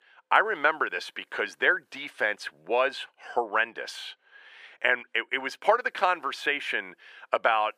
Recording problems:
thin; very; fading below 450 Hz

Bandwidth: 15 kHz